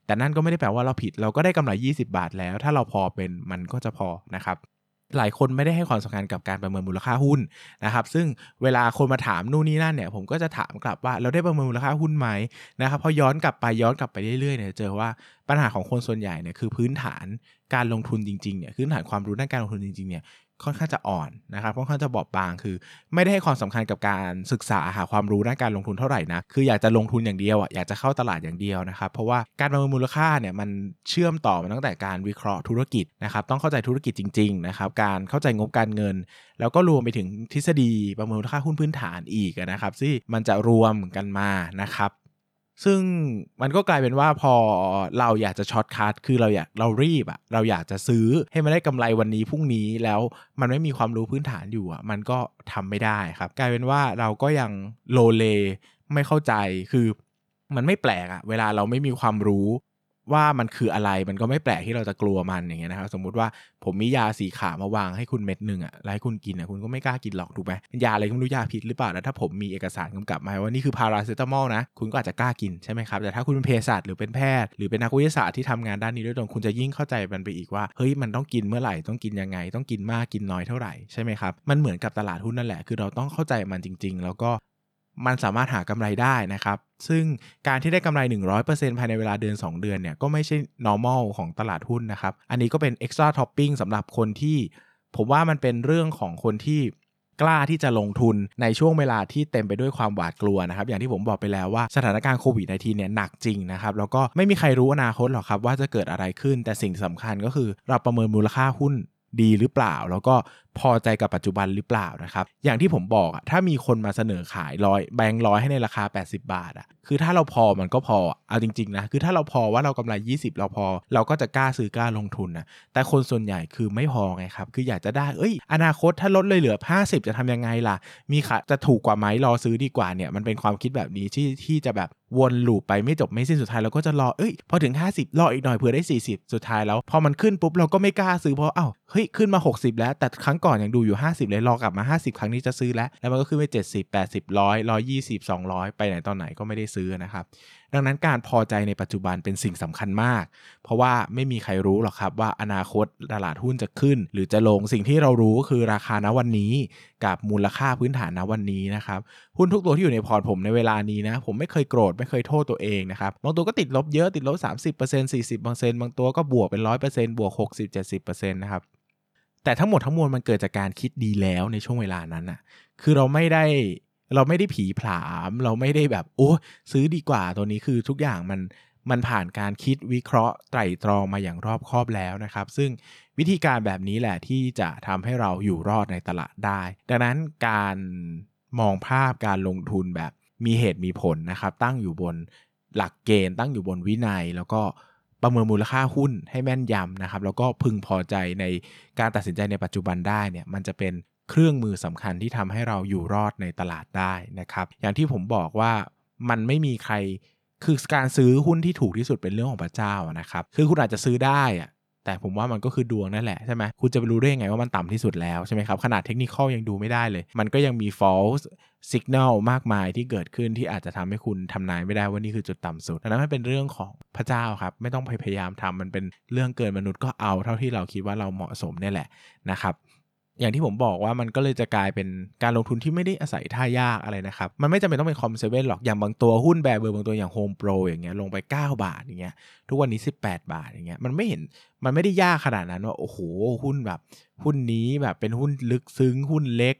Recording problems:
none

